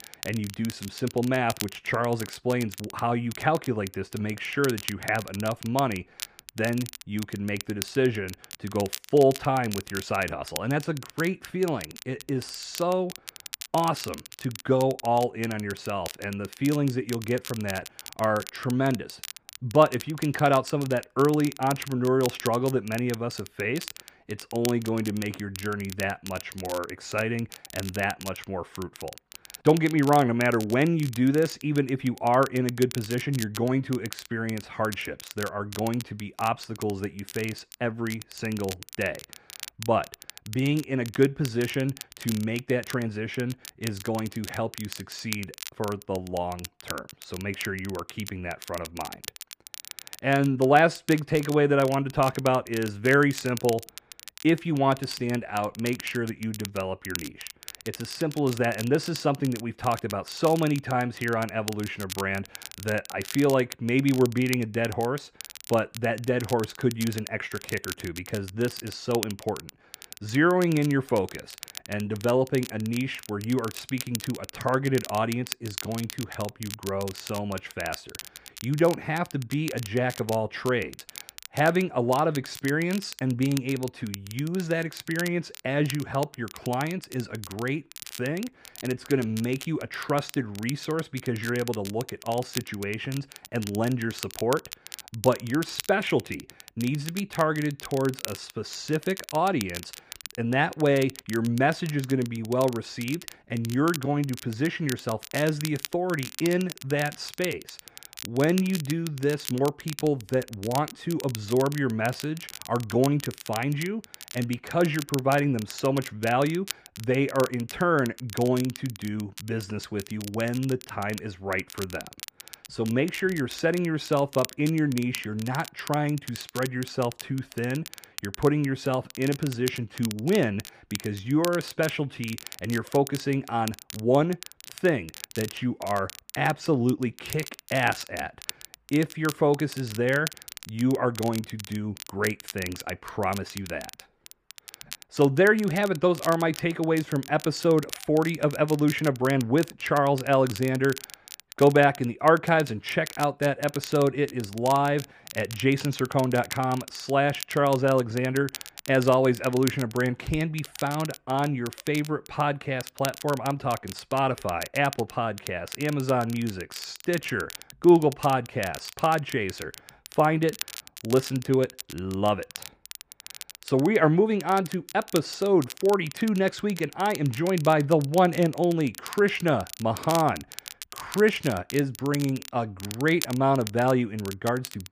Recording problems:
muffled; slightly; fading above 3.5 kHz
crackle, like an old record; noticeable; 15 dB below the speech

